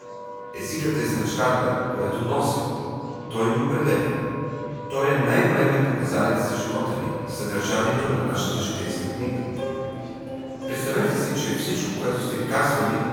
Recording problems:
room echo; strong; dies away in 2.6 s
off-mic speech; far
background music; noticeable; throughout; 10 dB below the speech
murmuring crowd; faint; throughout; 20 dB below the speech

